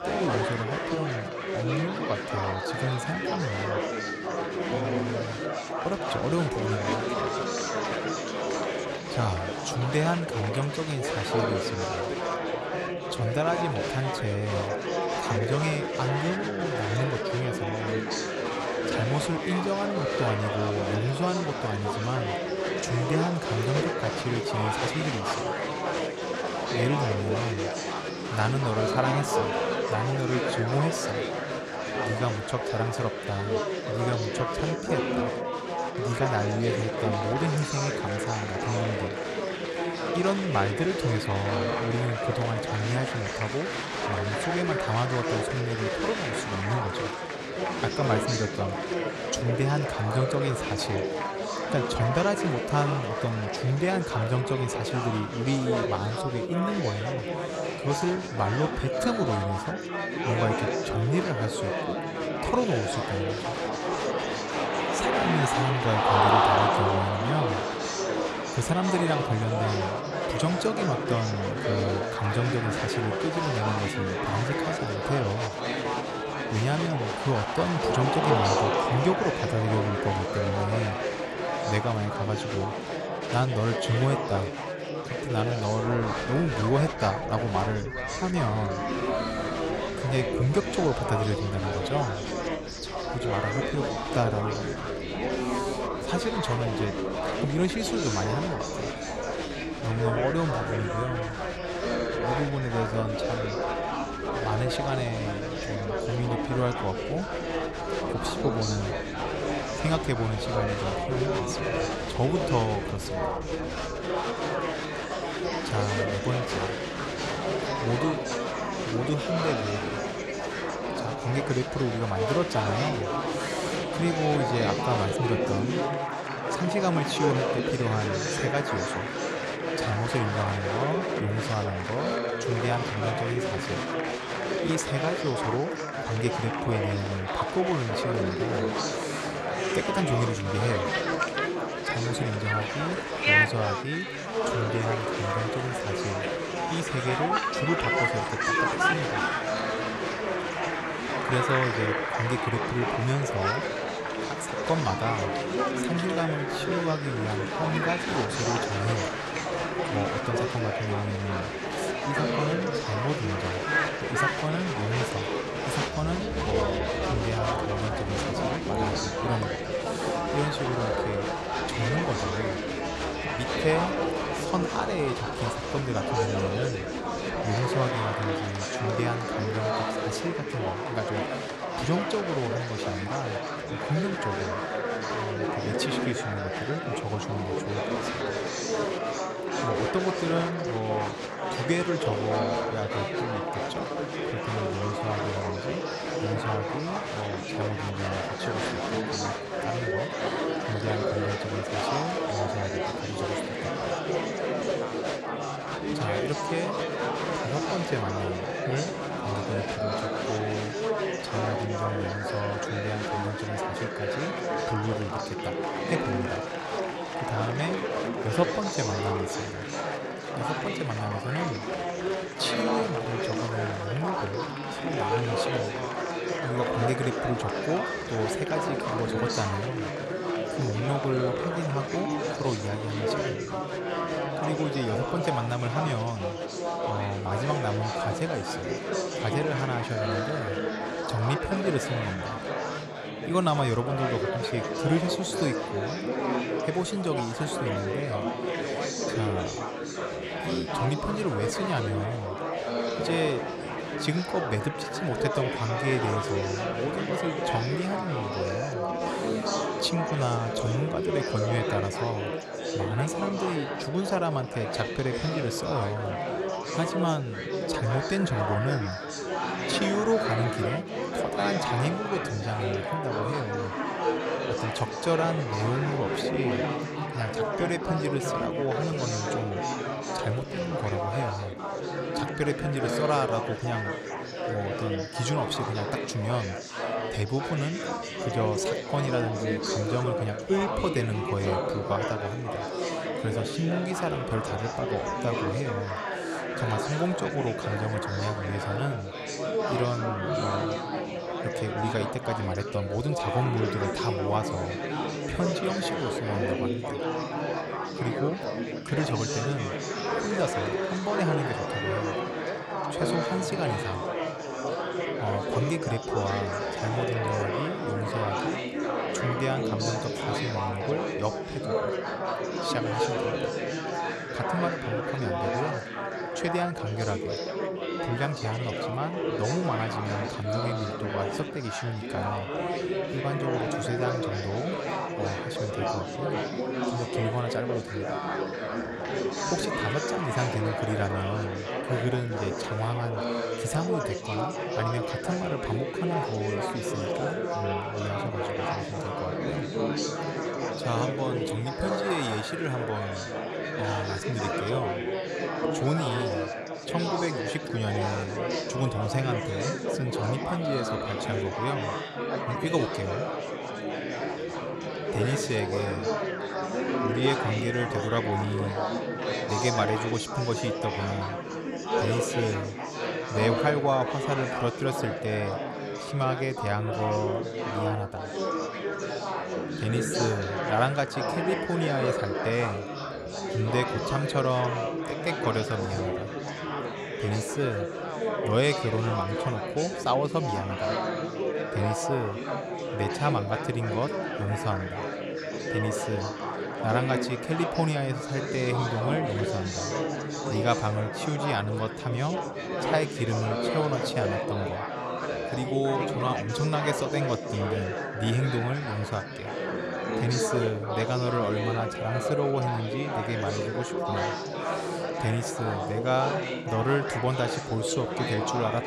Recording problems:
chatter from many people; very loud; throughout; 1 dB above the speech

